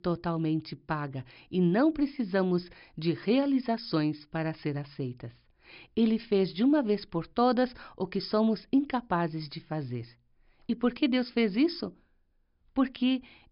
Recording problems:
high frequencies cut off; noticeable; nothing above 5.5 kHz

